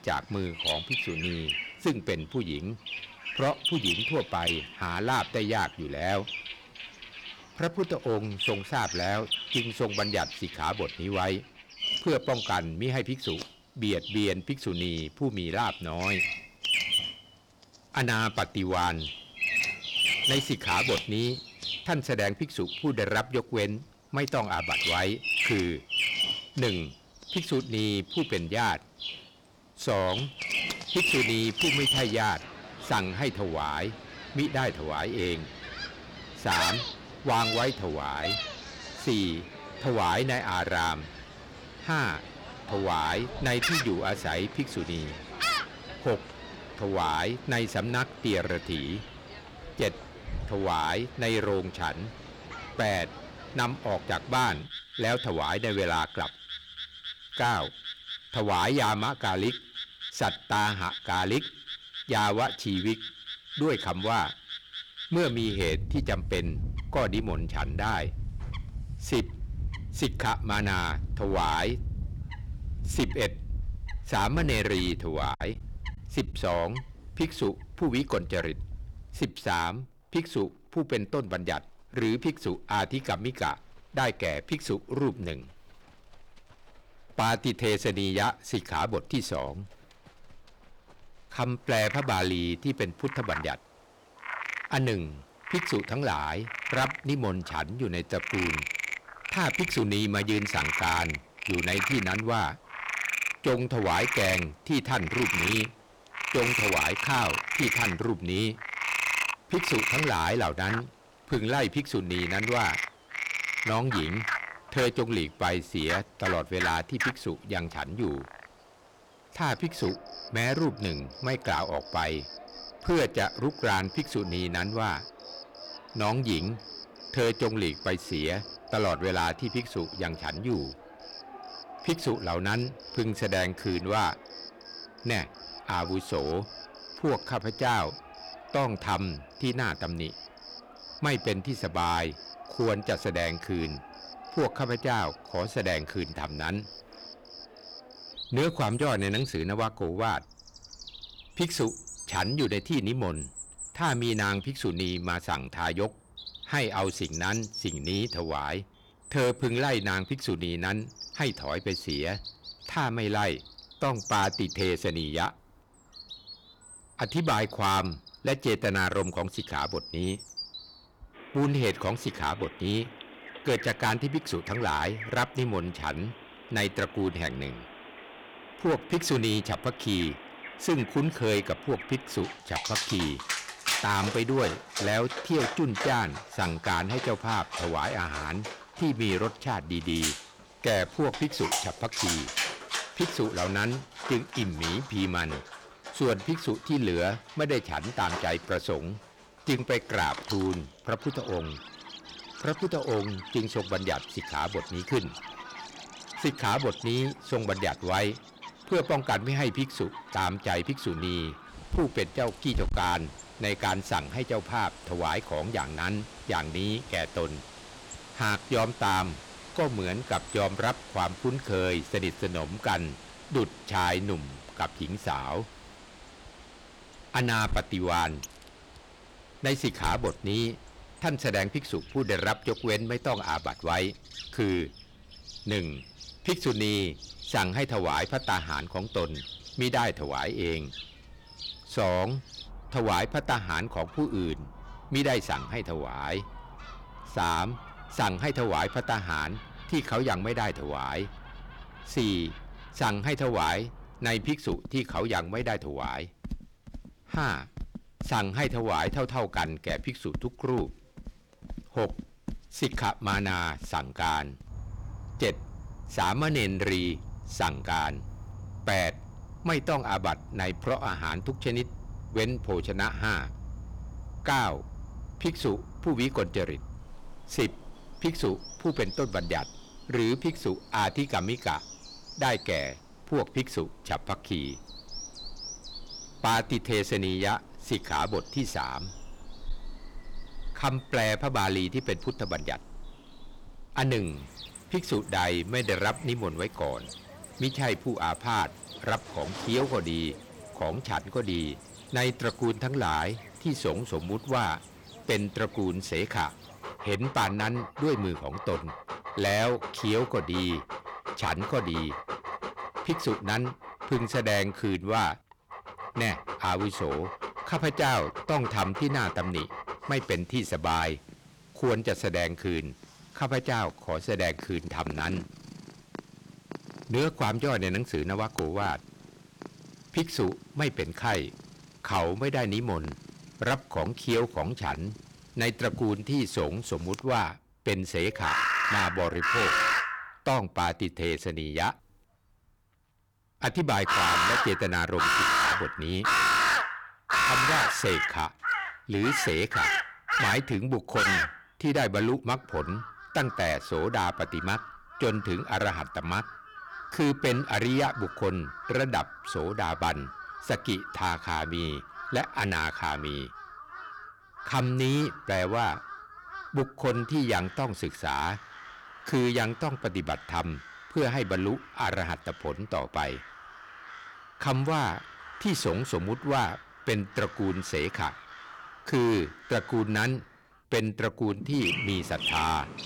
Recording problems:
distortion; heavy; 6% of the sound clipped
animal sounds; loud; throughout; 5 dB below the speech
choppy; very; at 1:15; 10% of the speech affected

